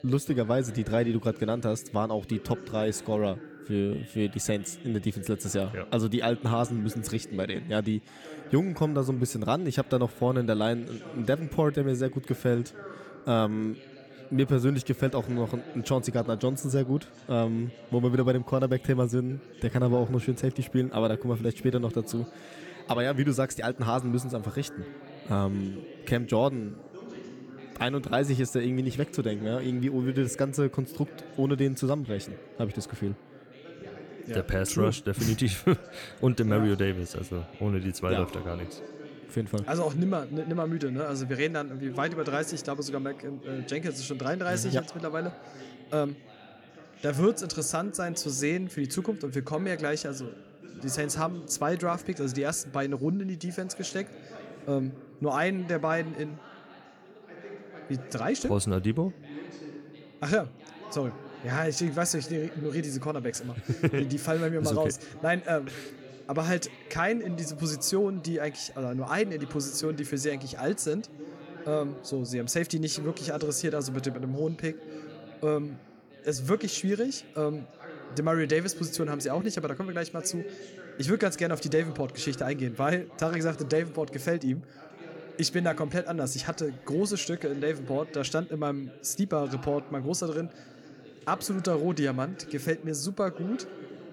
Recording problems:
background chatter; noticeable; throughout; 2 voices, 15 dB below the speech

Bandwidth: 18 kHz